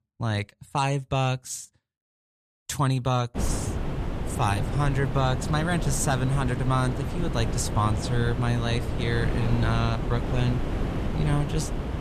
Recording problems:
wind noise on the microphone; heavy; from 3.5 s on; 6 dB below the speech

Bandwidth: 14 kHz